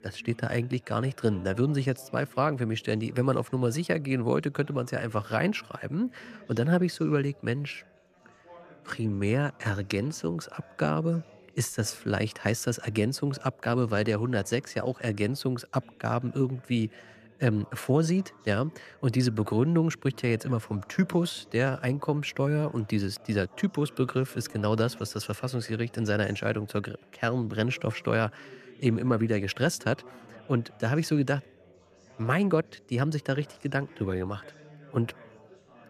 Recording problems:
background chatter; faint; throughout; 3 voices, 25 dB below the speech

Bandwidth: 14.5 kHz